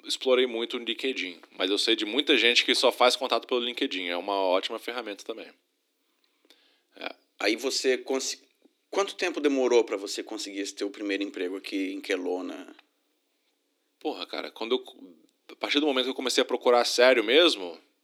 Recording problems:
thin; somewhat; fading below 300 Hz

